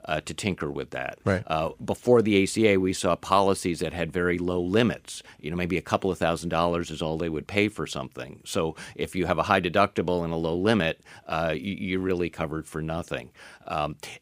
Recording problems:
none

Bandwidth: 15.5 kHz